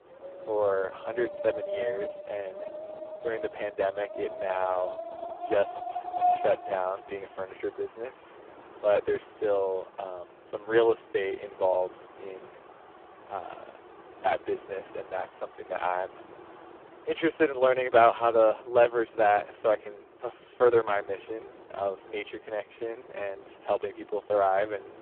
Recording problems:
phone-call audio; poor line
wind in the background; noticeable; throughout; 10 dB below the speech

